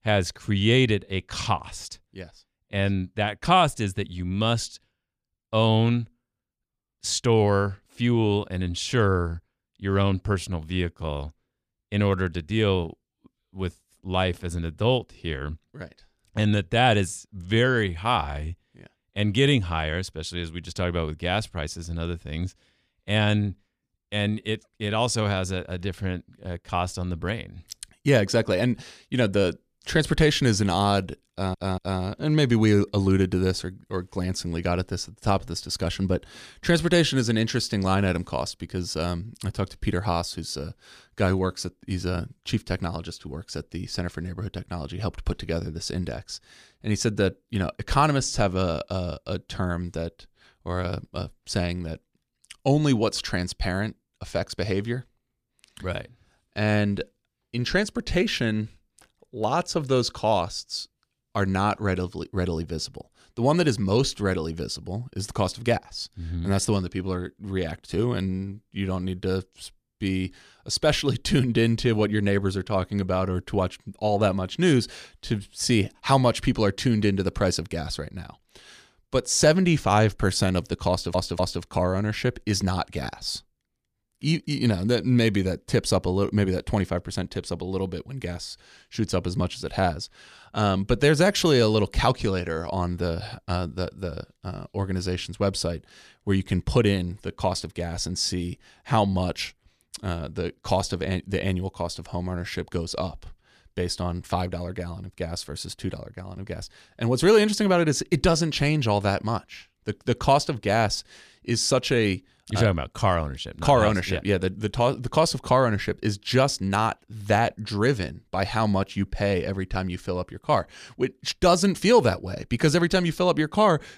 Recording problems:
audio stuttering; at 31 s and at 1:21

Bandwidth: 14.5 kHz